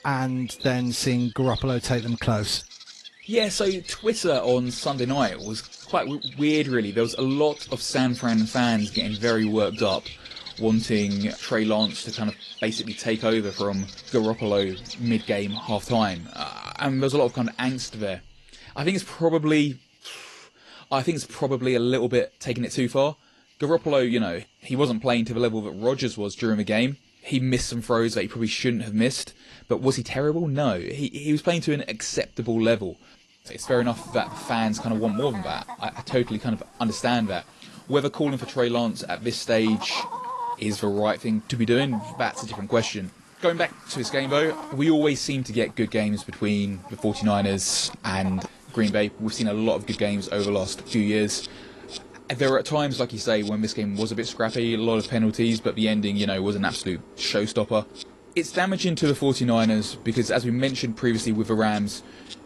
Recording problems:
garbled, watery; slightly; nothing above 11.5 kHz
animal sounds; noticeable; throughout; 15 dB below the speech

